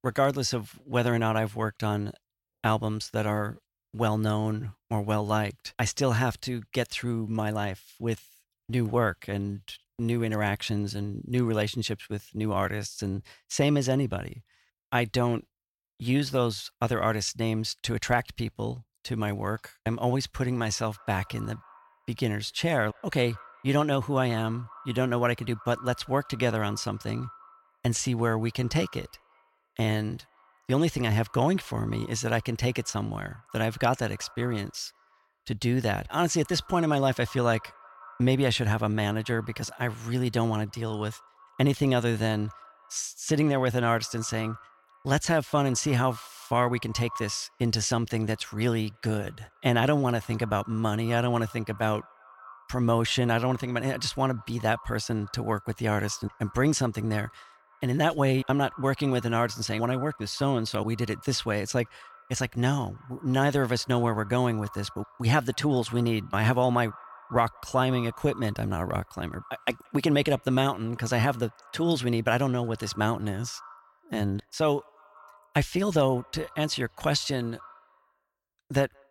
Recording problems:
echo of what is said; faint; from 20 s on; 180 ms later, 20 dB below the speech

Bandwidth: 16.5 kHz